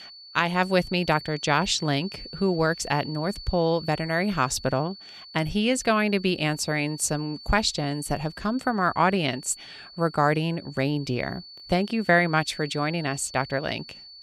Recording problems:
high-pitched whine; noticeable; throughout; 4.5 kHz, 15 dB below the speech

